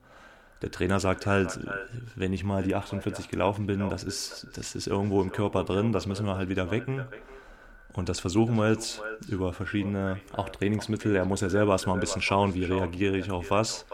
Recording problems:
echo of what is said; noticeable; throughout; 400 ms later, 15 dB below the speech

